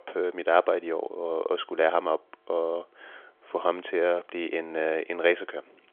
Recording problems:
phone-call audio; nothing above 3.5 kHz

